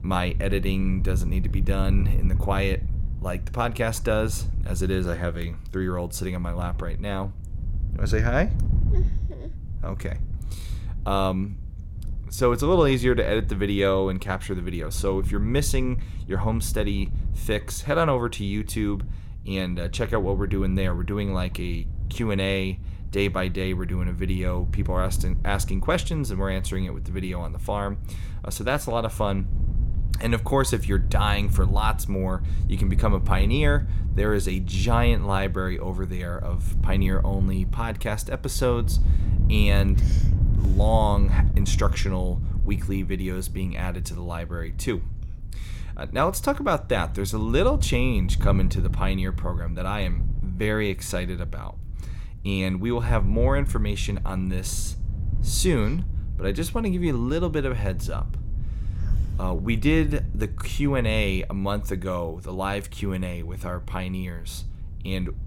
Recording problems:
wind noise on the microphone; occasional gusts; 15 dB below the speech

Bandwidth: 16.5 kHz